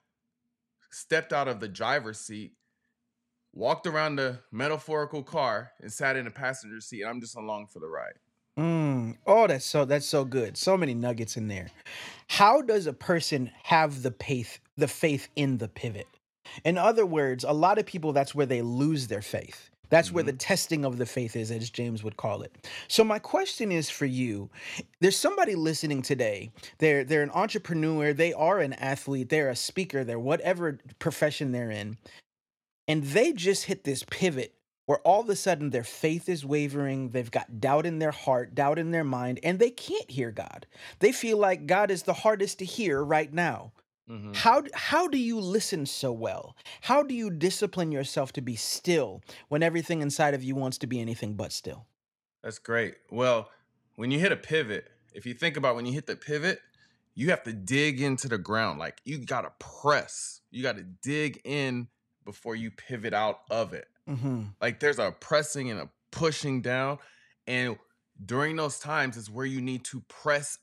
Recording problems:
none

